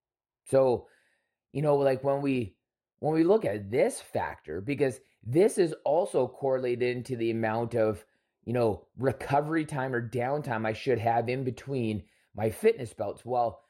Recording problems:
muffled; slightly; fading above 2 kHz

